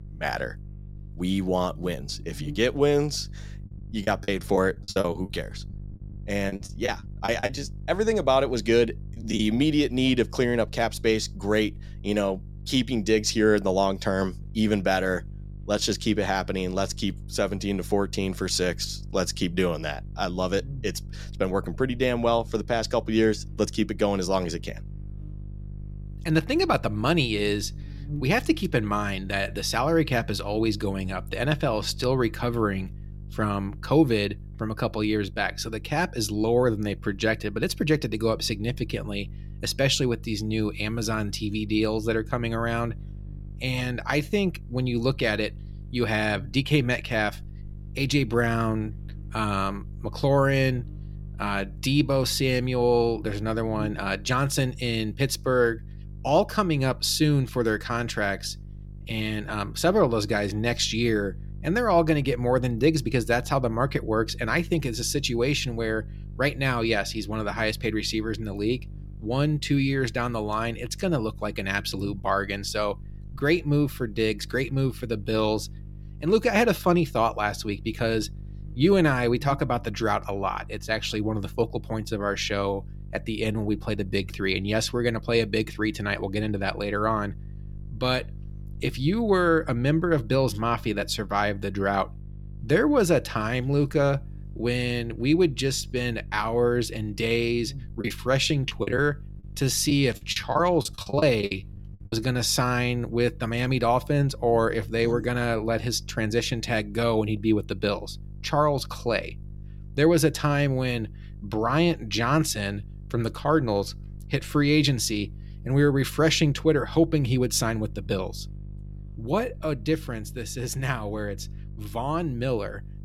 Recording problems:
electrical hum; faint; throughout; 50 Hz, 25 dB below the speech
choppy; very; from 4 to 7.5 s and from 1:38 to 1:42; 16% of the speech affected

